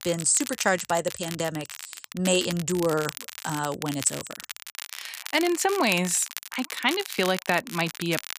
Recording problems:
crackle, like an old record; noticeable; 10 dB below the speech

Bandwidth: 15 kHz